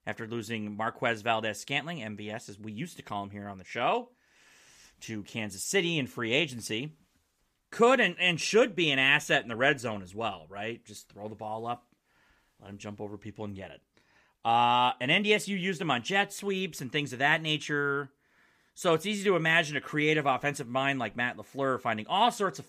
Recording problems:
none

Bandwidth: 15 kHz